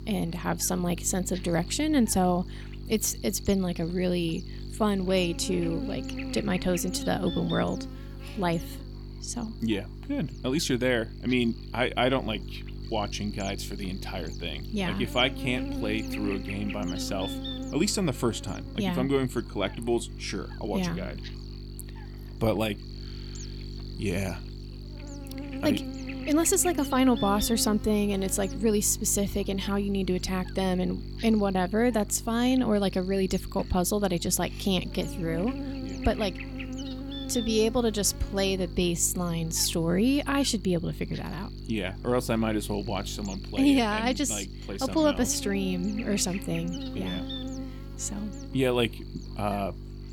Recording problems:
electrical hum; noticeable; throughout; 50 Hz, 15 dB below the speech

